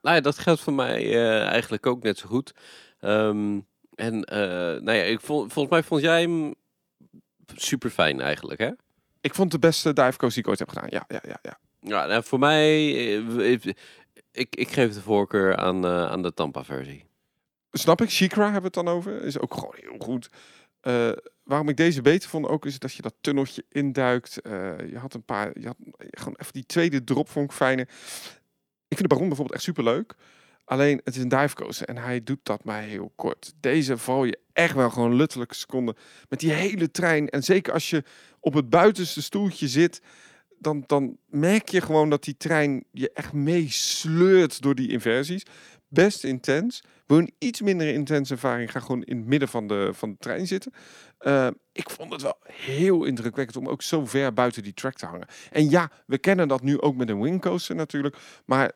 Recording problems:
uneven, jittery; strongly; from 29 to 47 s

